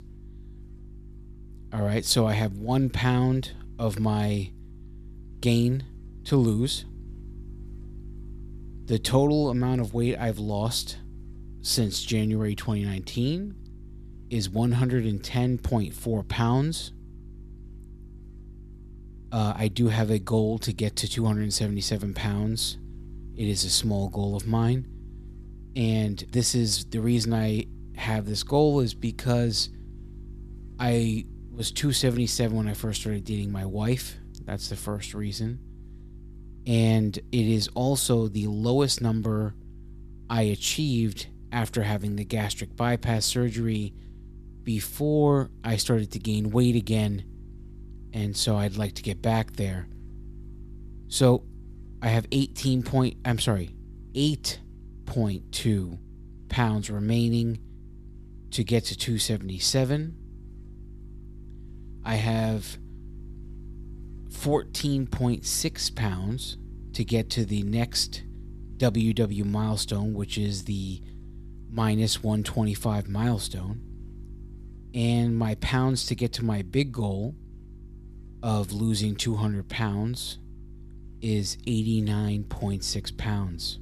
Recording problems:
electrical hum; faint; throughout; 50 Hz, 25 dB below the speech

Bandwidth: 14.5 kHz